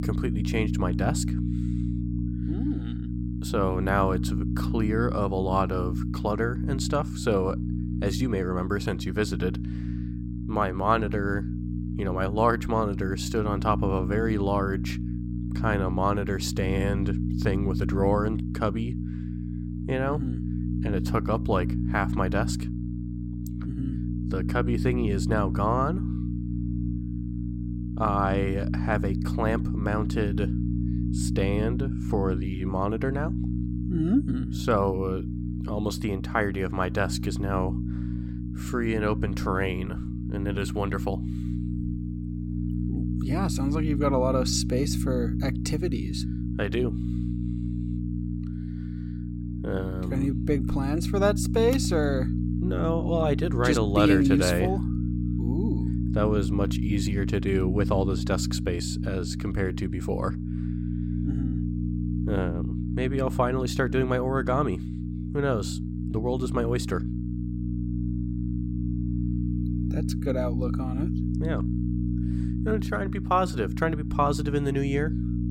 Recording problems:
electrical hum; loud; throughout; 60 Hz, 9 dB below the speech

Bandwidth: 16.5 kHz